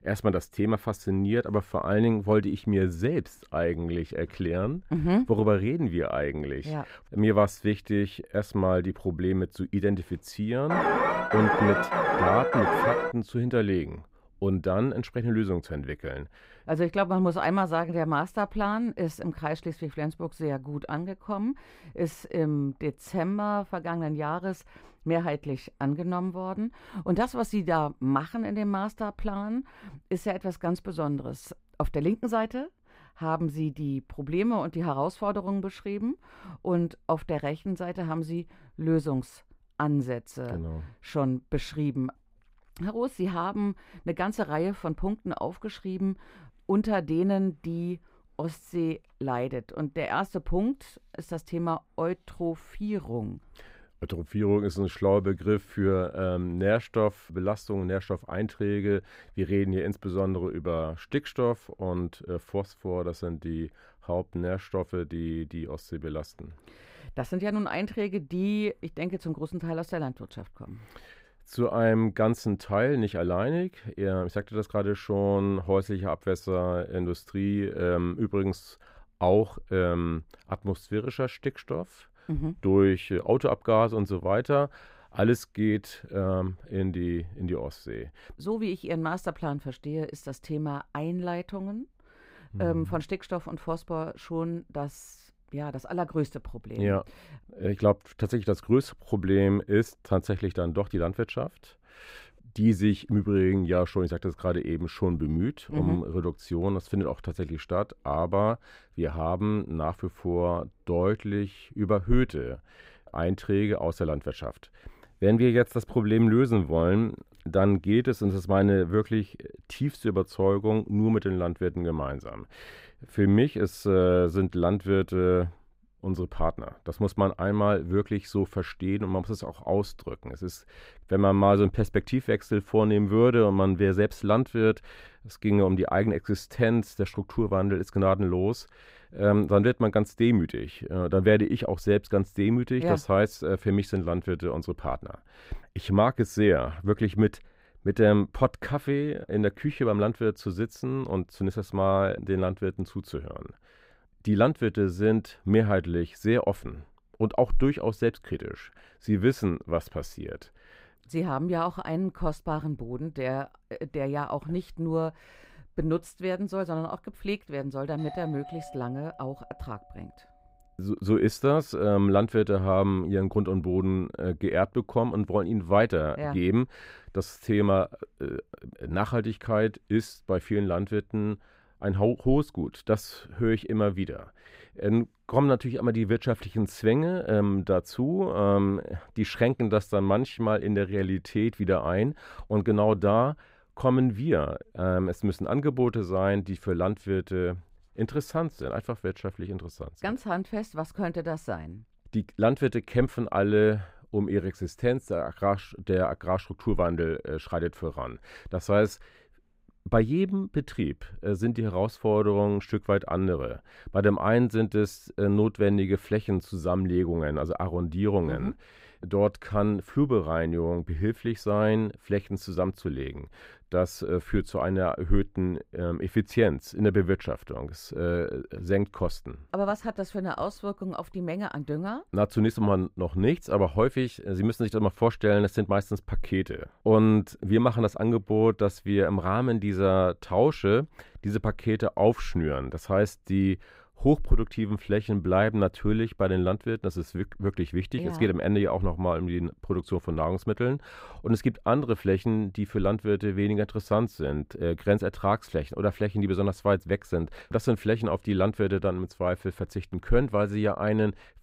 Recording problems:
muffled; slightly; fading above 2.5 kHz
alarm; loud; from 11 to 13 s; peak 4 dB above the speech
doorbell; faint; from 2:48 to 2:50; peak 15 dB below the speech

